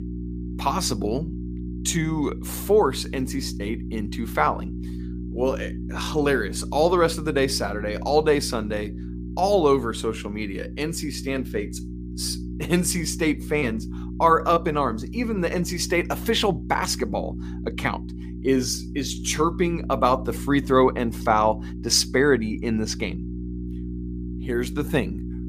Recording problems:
electrical hum; noticeable; throughout; 60 Hz, 15 dB below the speech

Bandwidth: 15 kHz